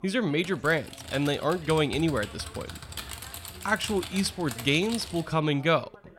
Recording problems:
background chatter; faint; throughout; 2 voices, 25 dB below the speech
keyboard typing; noticeable; until 5.5 s; peak 9 dB below the speech

